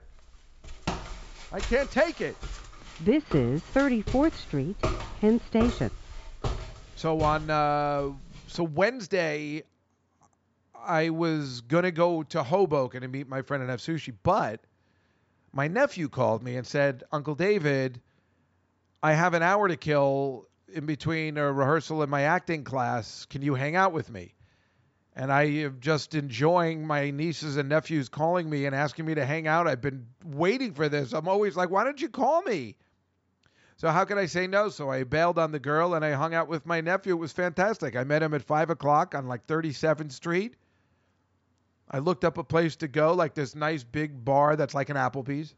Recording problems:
high frequencies cut off; noticeable; nothing above 8 kHz
footsteps; noticeable; from 0.5 to 8.5 s; peak 5 dB below the speech

